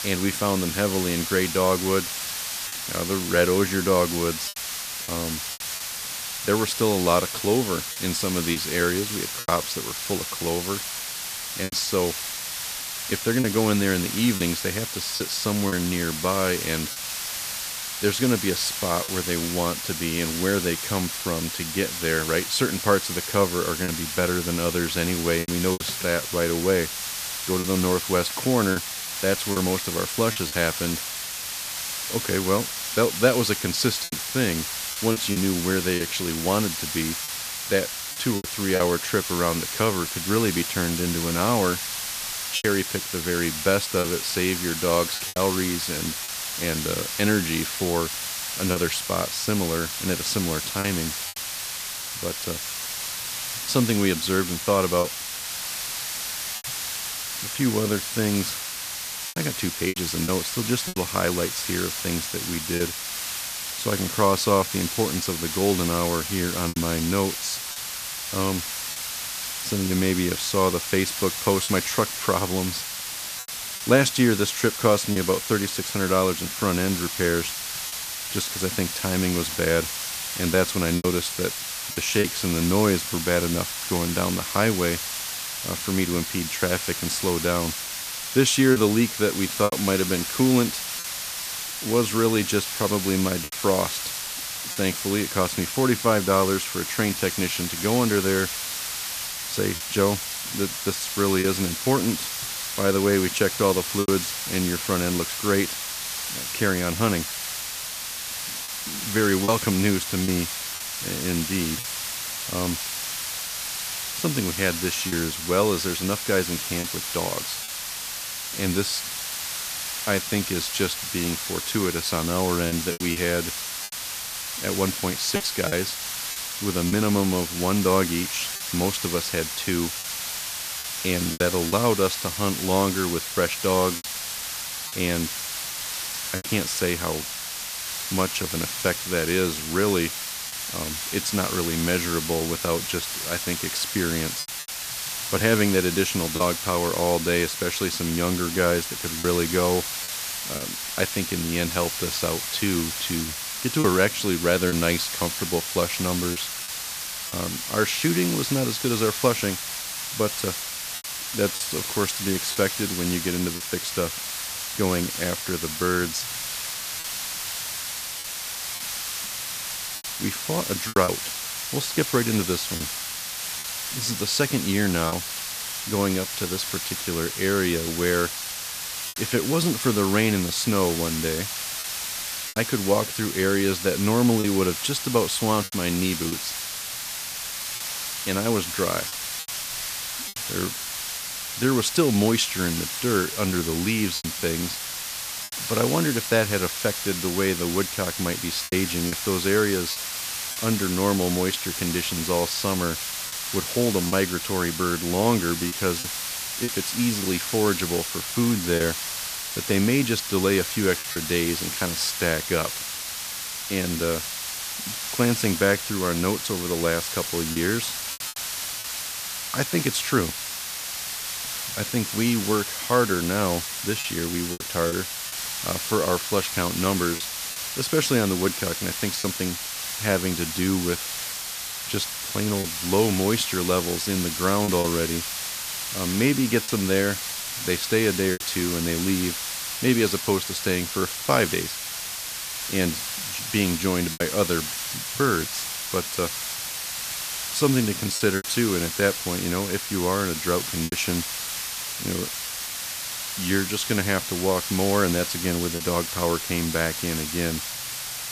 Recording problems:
hiss; loud; throughout; 3 dB below the speech
choppy; occasionally; 3% of the speech affected

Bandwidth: 14.5 kHz